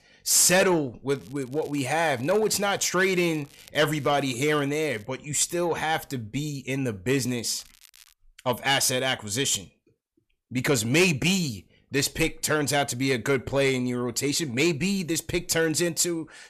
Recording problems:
distortion; slight; 10 dB below the speech
crackling; faint; from 1 to 5 s and at 7 s; 25 dB below the speech

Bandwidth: 14 kHz